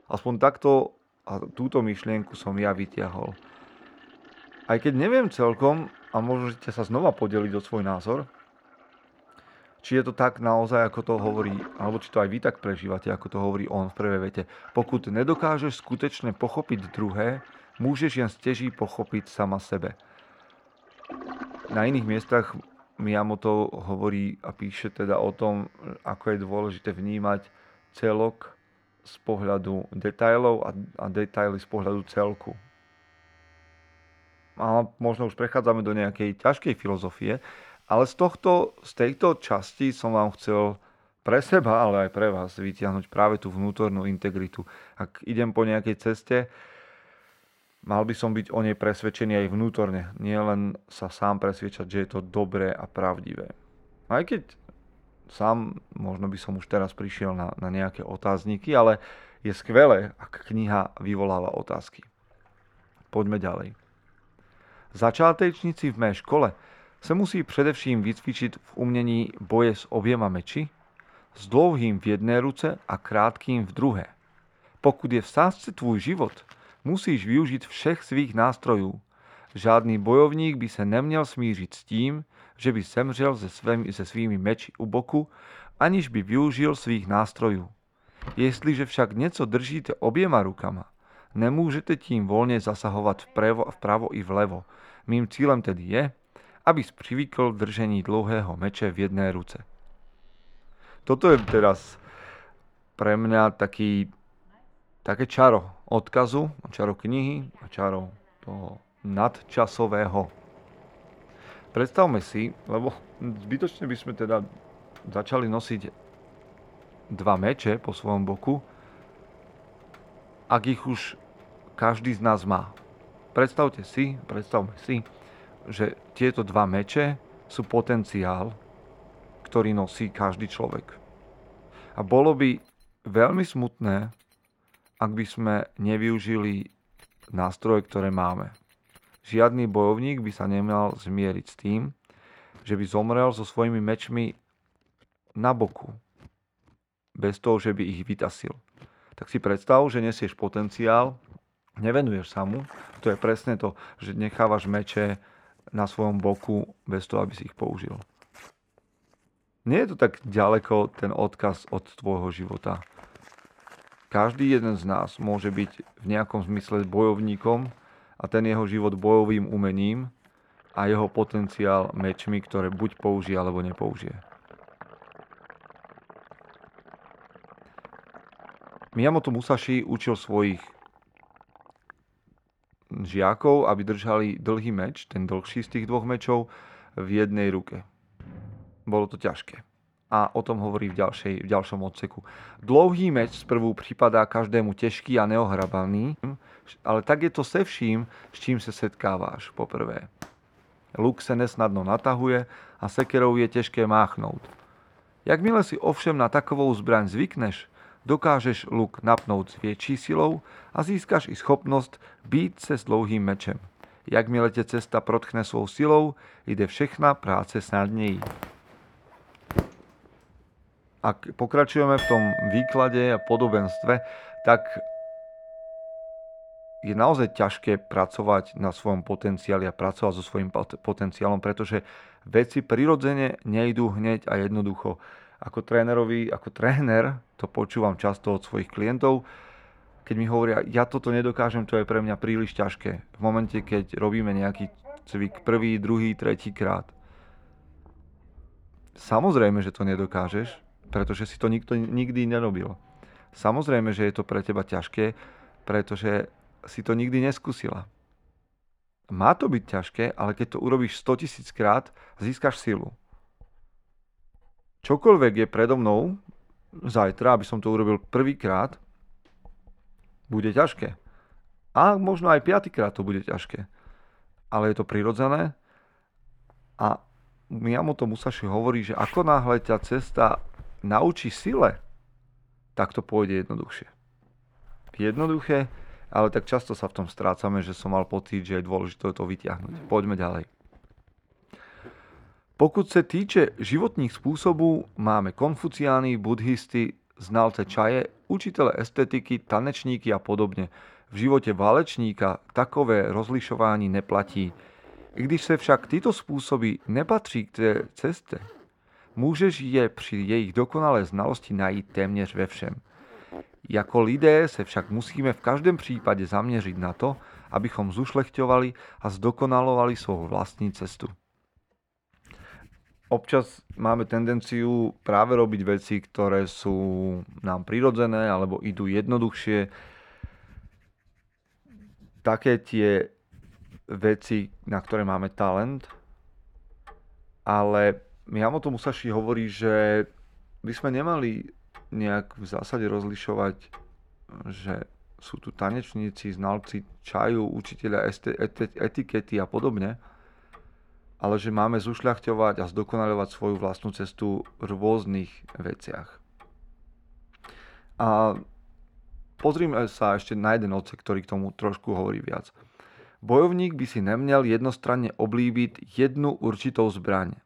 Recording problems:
muffled; very; fading above 3.5 kHz
household noises; noticeable; throughout; 20 dB below the speech

